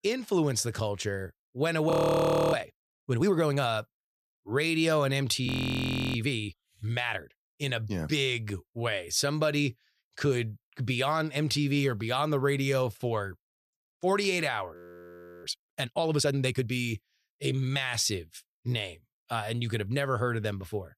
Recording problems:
audio freezing; at 2 s for 0.5 s, at 5.5 s for 0.5 s and at 15 s for 0.5 s

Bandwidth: 14.5 kHz